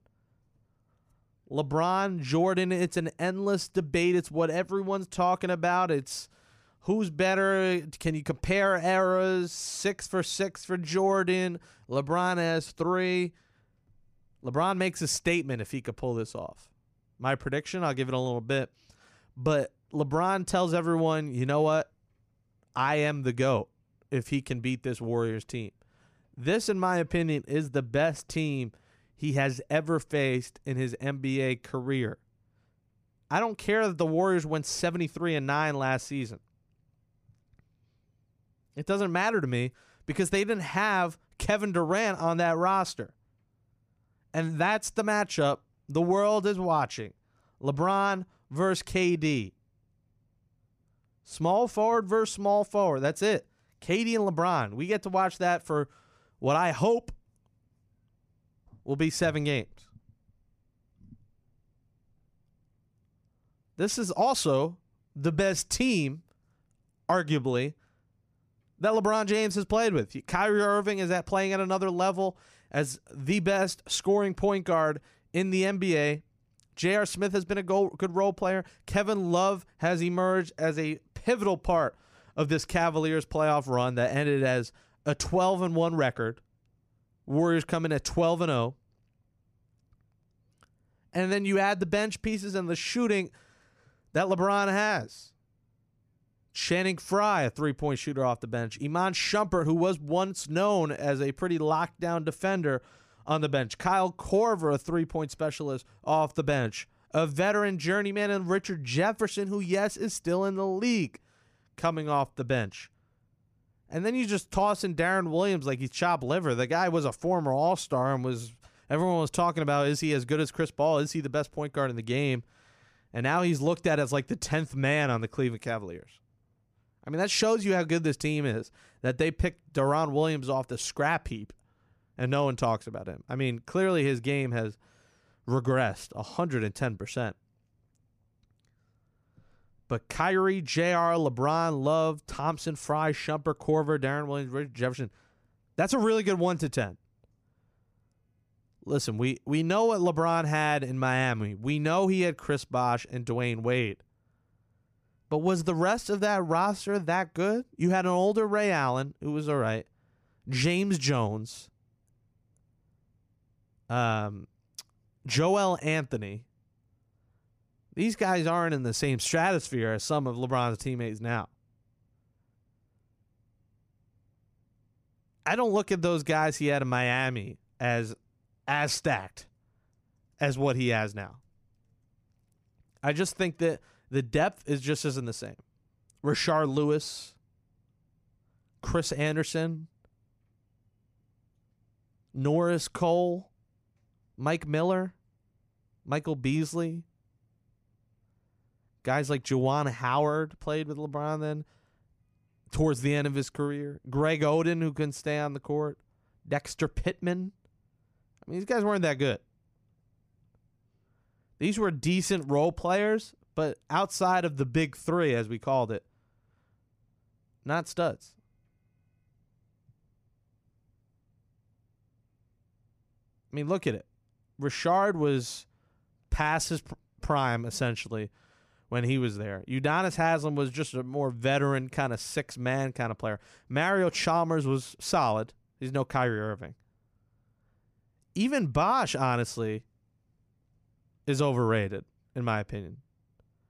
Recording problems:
none

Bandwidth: 15 kHz